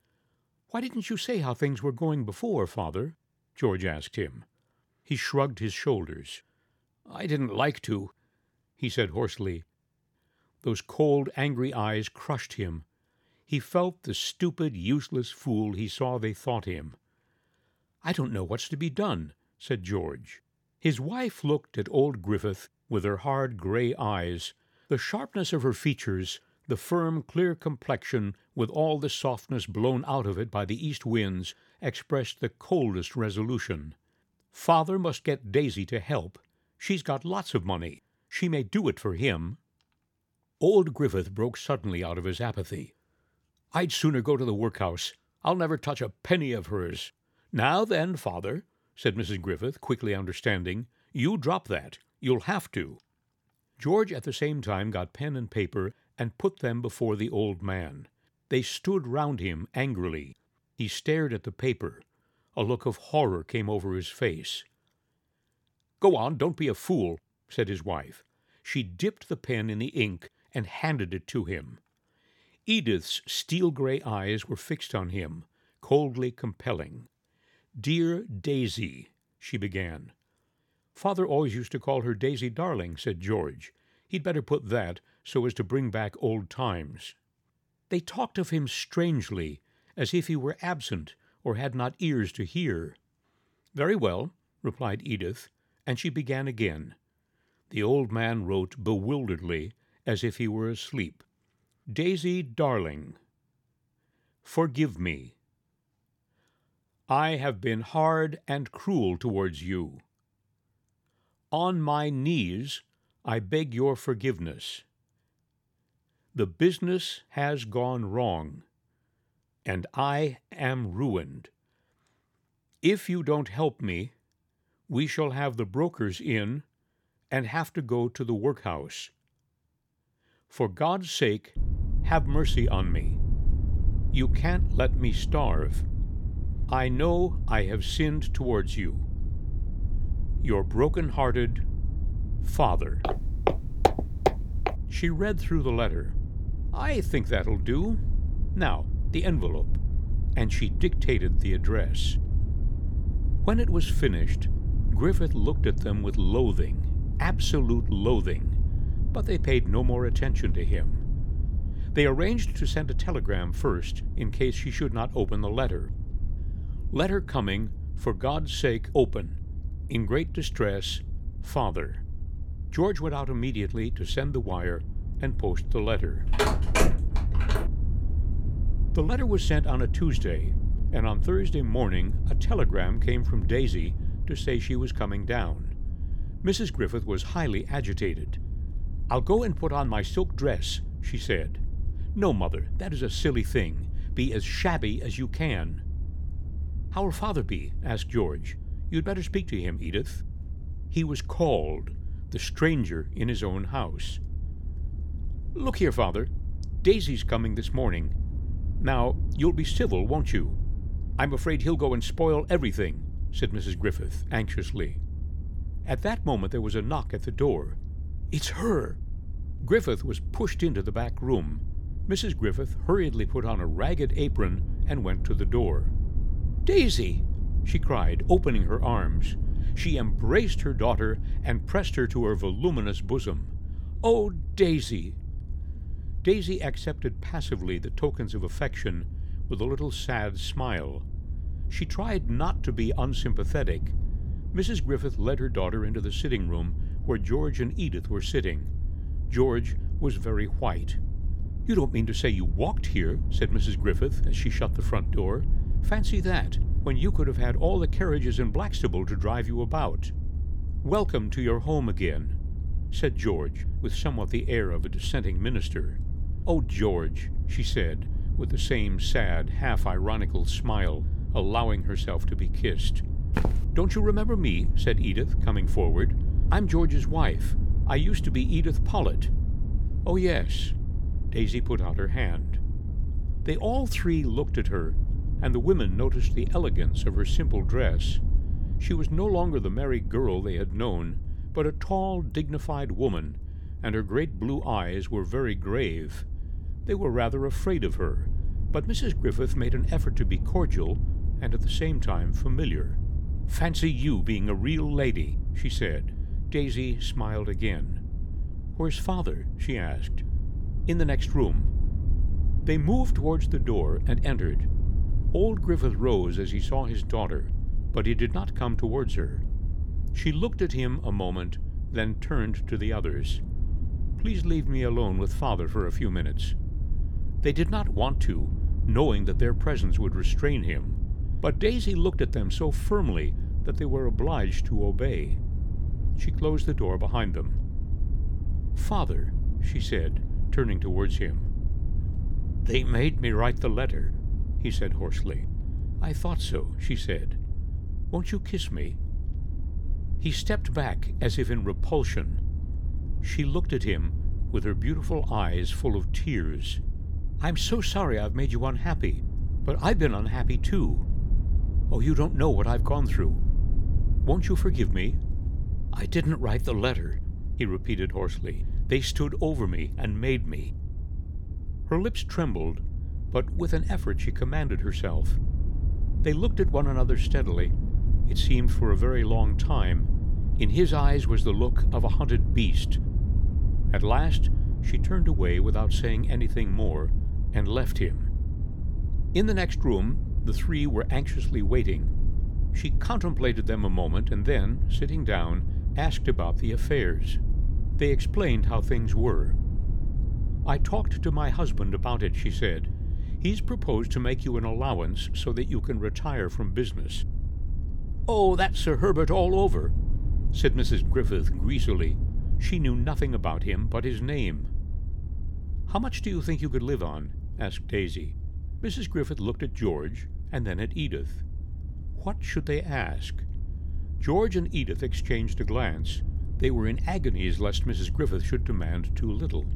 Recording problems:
low rumble; noticeable; from 2:12 on; 15 dB below the speech
footsteps; loud; from 2:23 to 2:25; peak 4 dB above the speech
phone ringing; loud; from 2:56 to 2:58; peak 4 dB above the speech
footsteps; noticeable; at 4:33; peak 2 dB below the speech

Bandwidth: 18 kHz